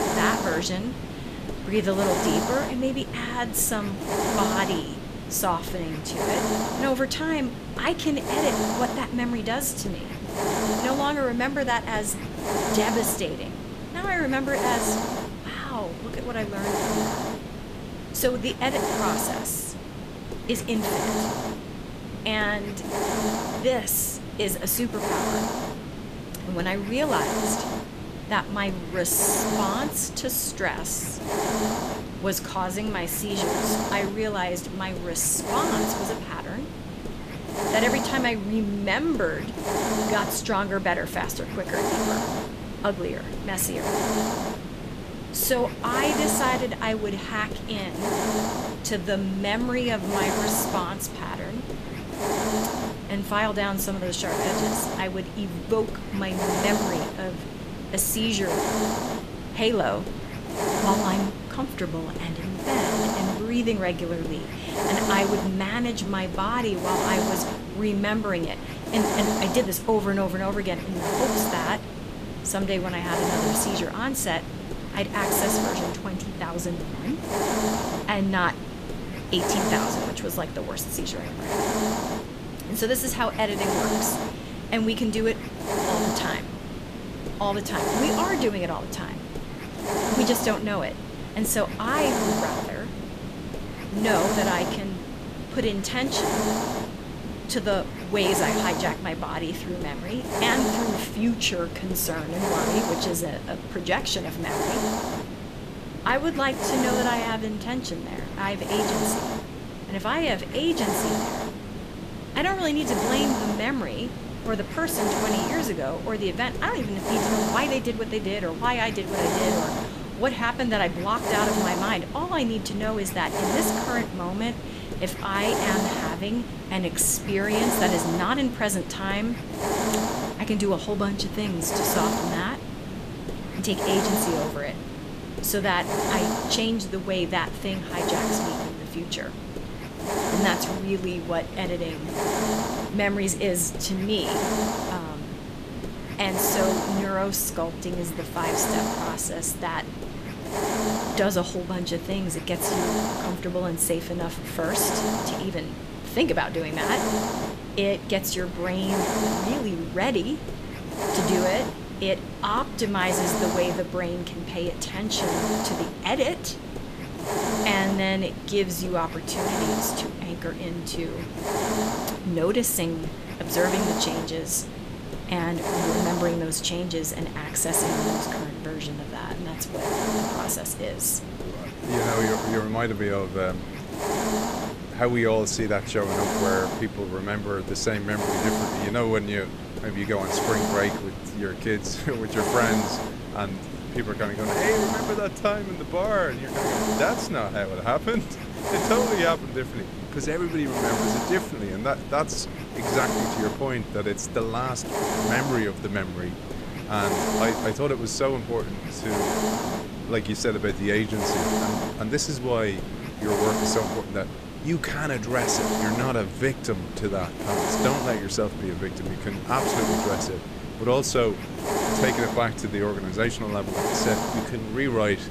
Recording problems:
hiss; loud; throughout; 2 dB below the speech

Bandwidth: 14.5 kHz